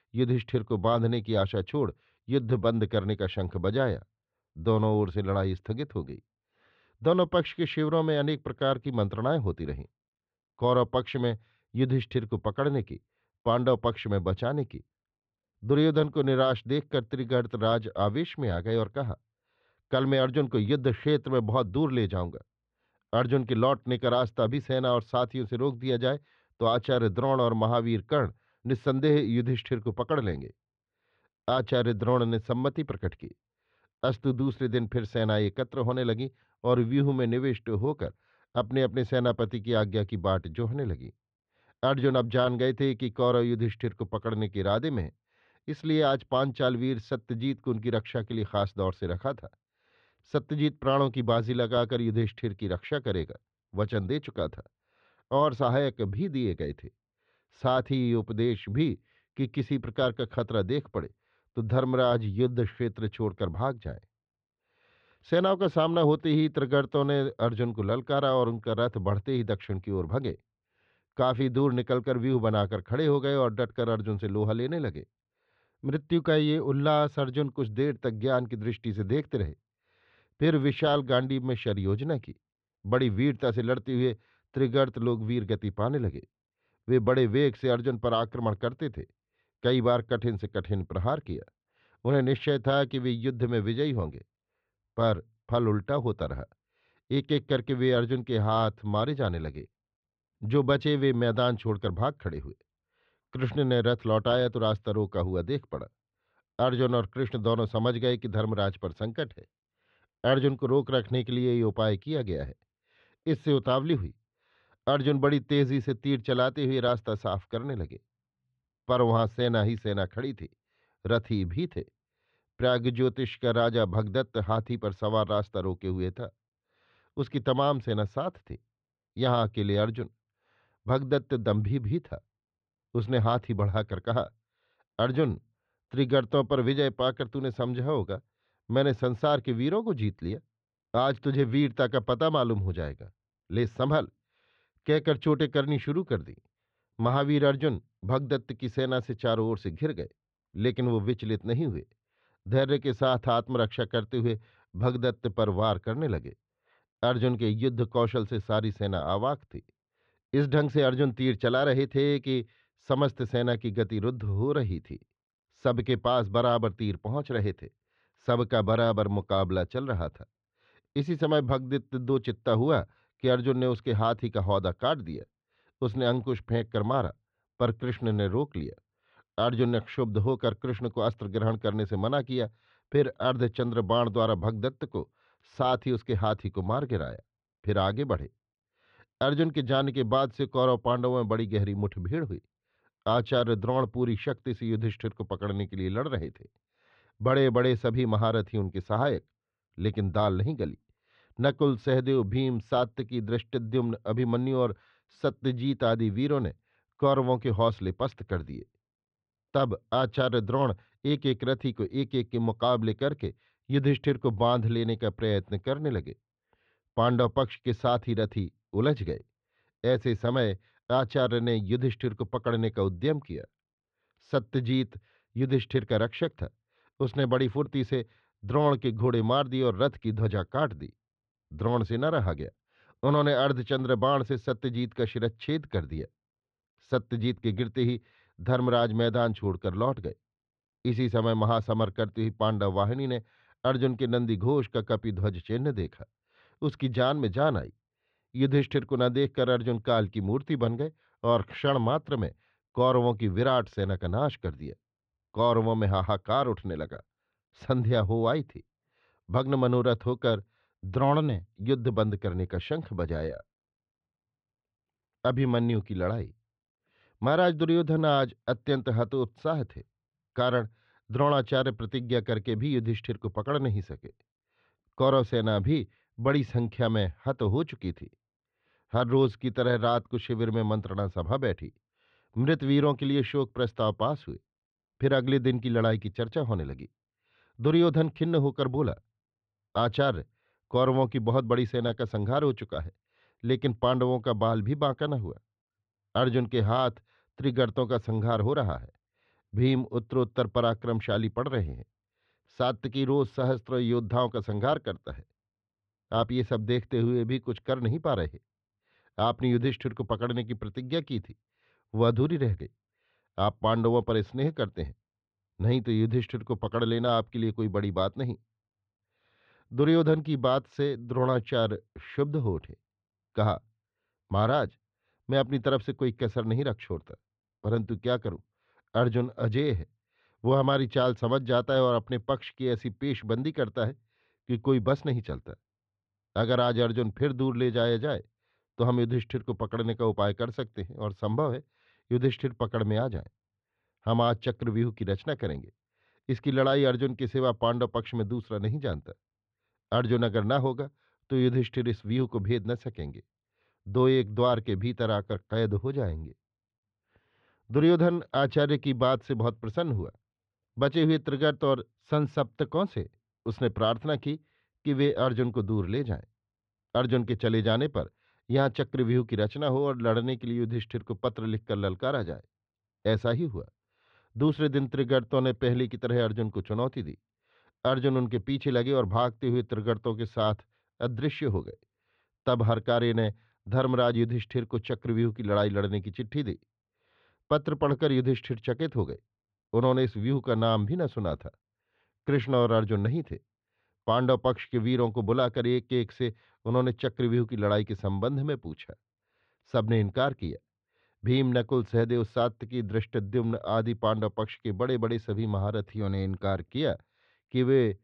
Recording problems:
muffled; slightly; fading above 3 kHz

